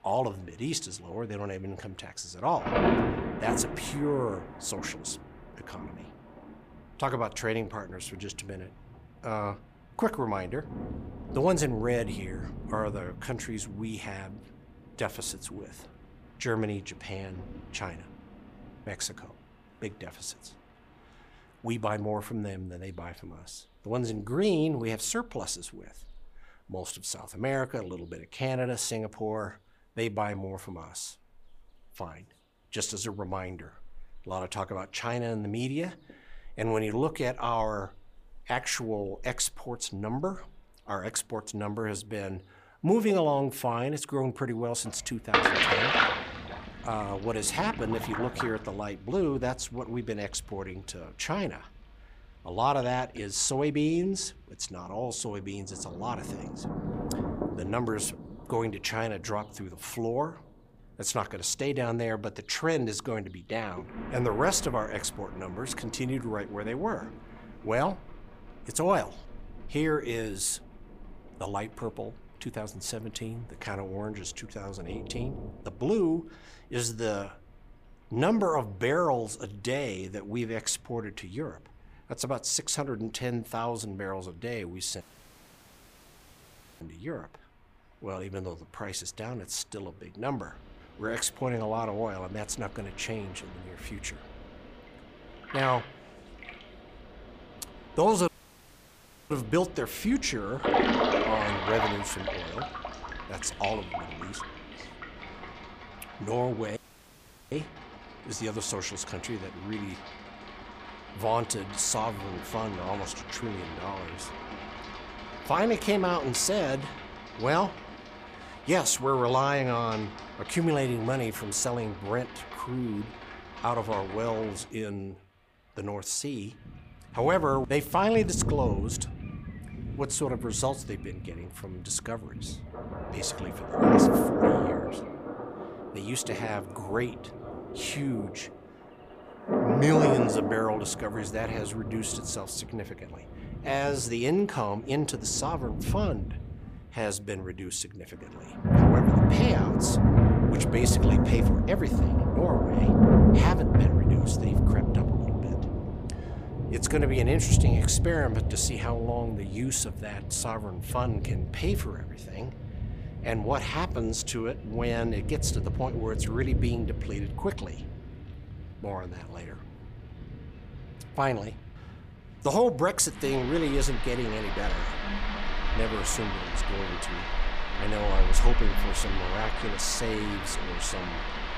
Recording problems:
rain or running water; very loud; throughout; 2 dB above the speech
audio cutting out; at 1:25 for 2 s, at 1:38 for 1 s and at 1:47 for 0.5 s

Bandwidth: 15 kHz